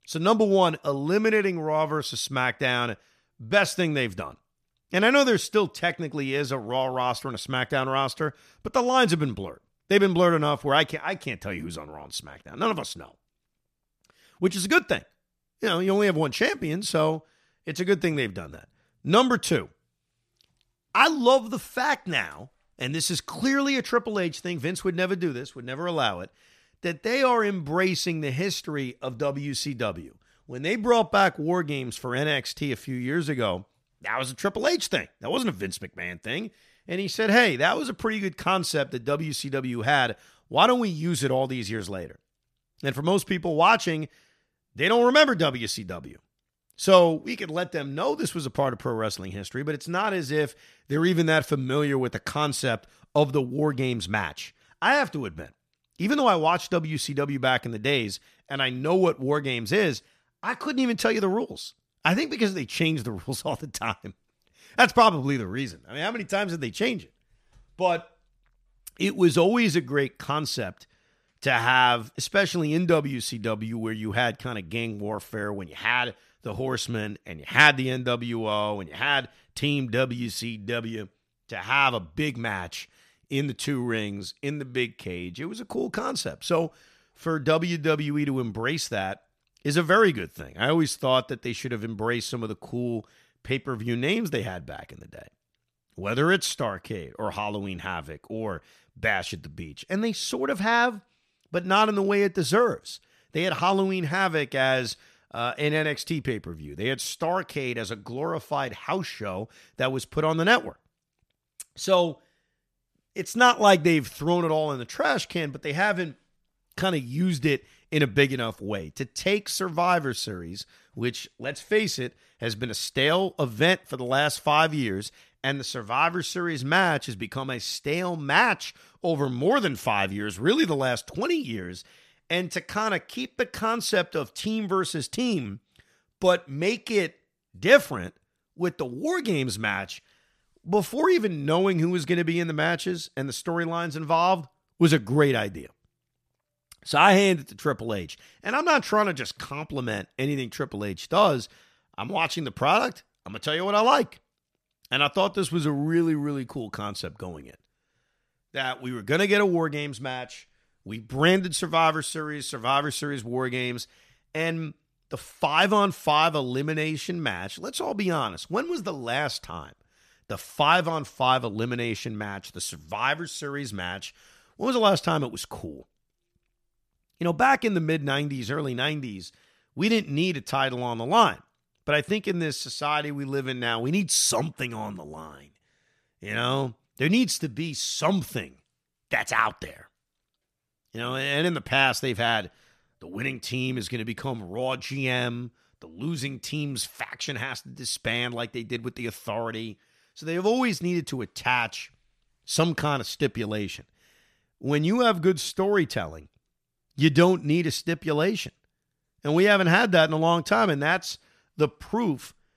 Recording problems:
none

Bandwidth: 14.5 kHz